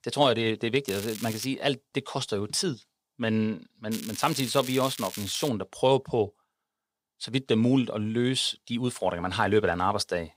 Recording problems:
crackling; noticeable; at 1 s and from 4 to 5.5 s; 10 dB below the speech

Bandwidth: 15.5 kHz